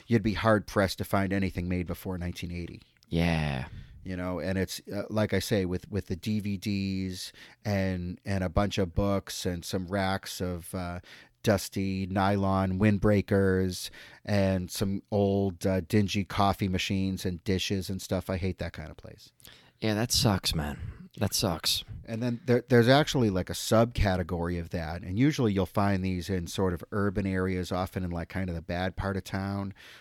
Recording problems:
none

